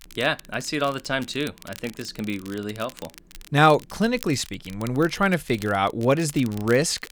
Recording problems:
crackle, like an old record; faint; 20 dB below the speech

